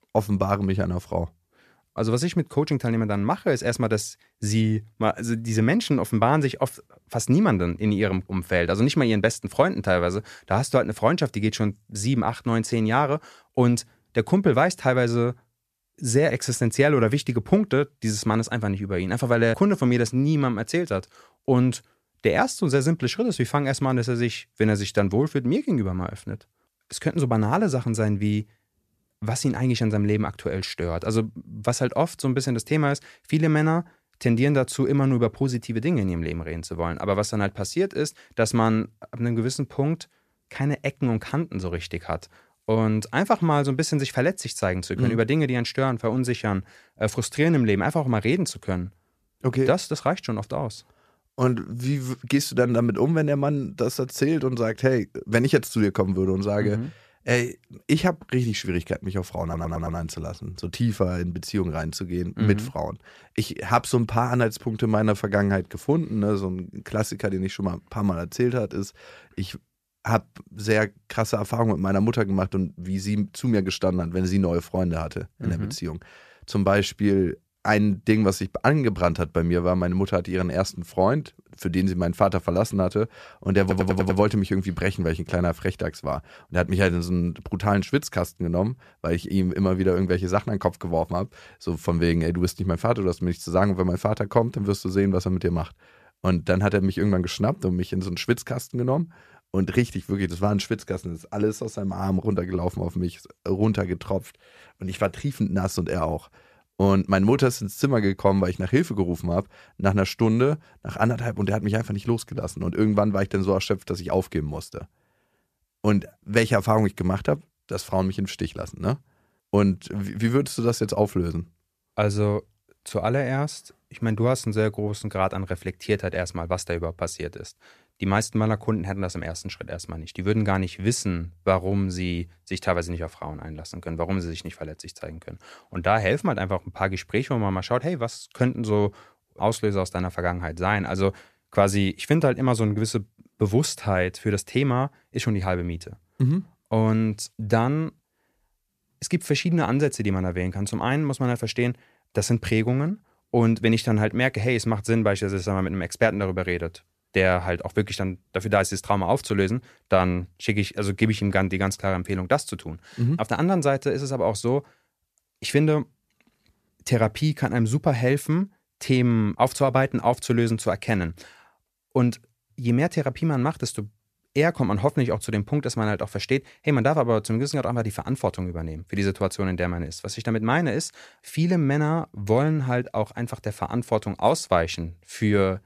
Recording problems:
audio stuttering; at 59 s and at 1:24

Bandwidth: 14.5 kHz